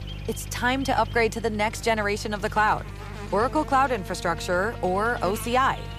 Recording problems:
electrical hum; noticeable; throughout; 50 Hz, 15 dB below the speech

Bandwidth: 14.5 kHz